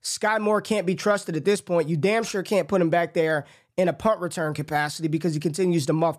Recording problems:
none

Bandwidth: 14.5 kHz